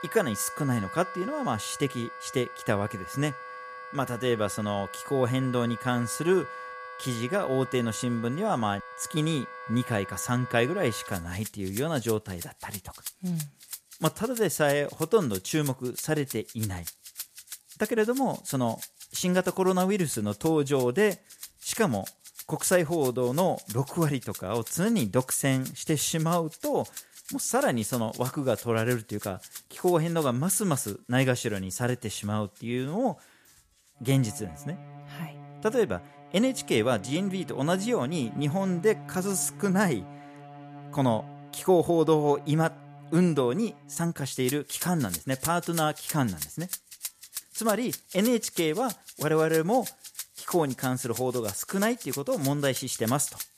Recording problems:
background music; noticeable; throughout; 15 dB below the speech

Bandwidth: 14.5 kHz